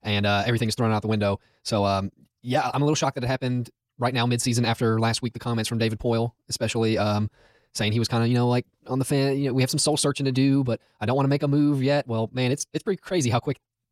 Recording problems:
wrong speed, natural pitch; too fast; 1.5 times normal speed

